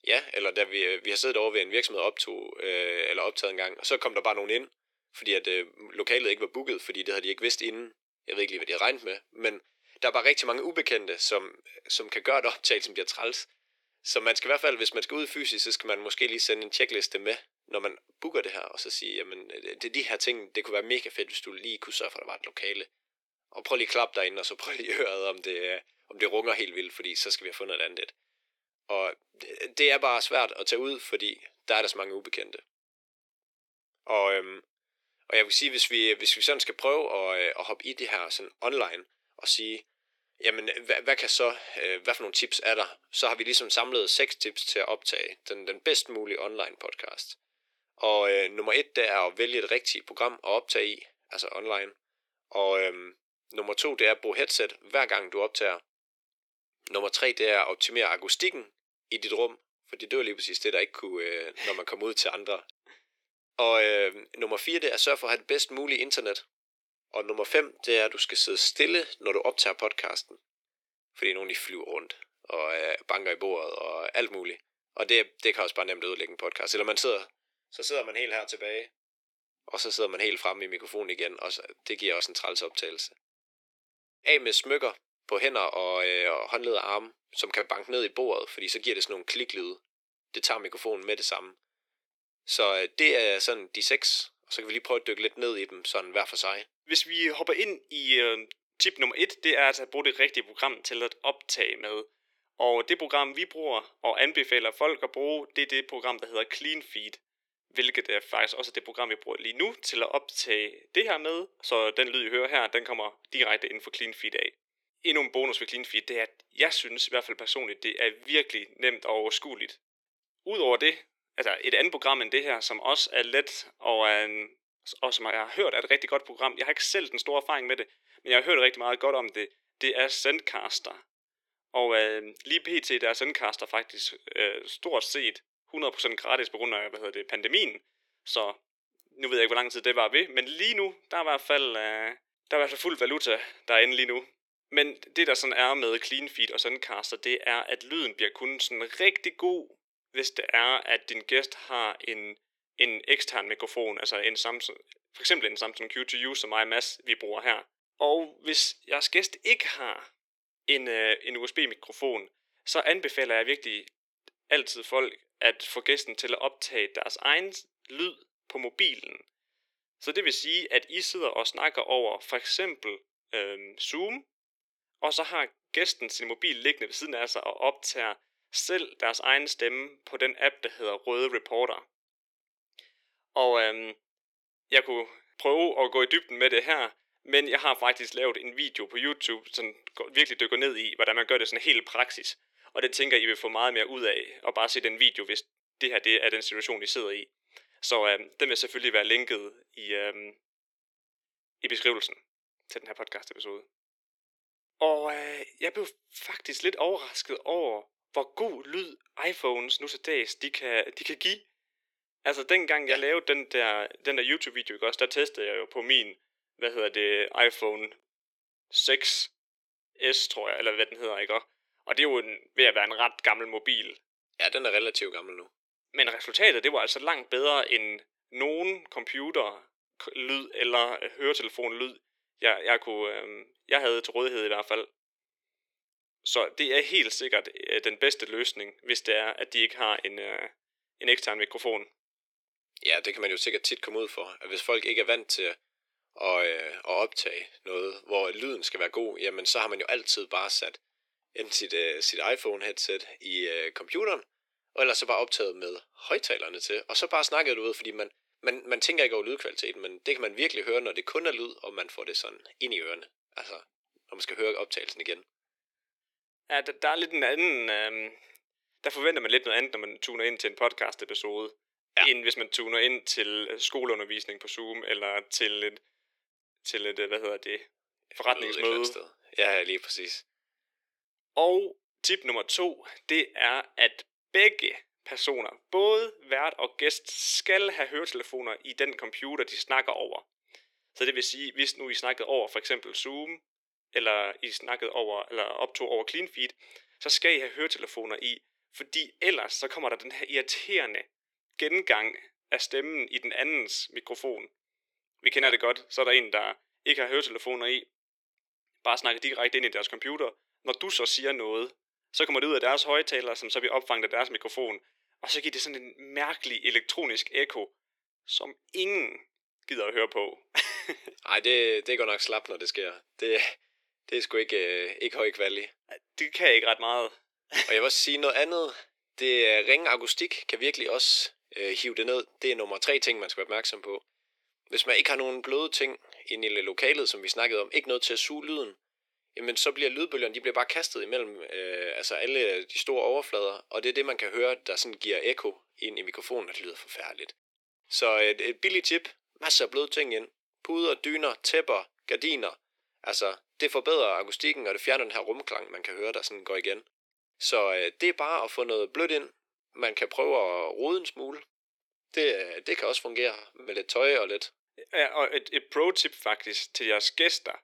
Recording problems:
thin; very; fading below 350 Hz

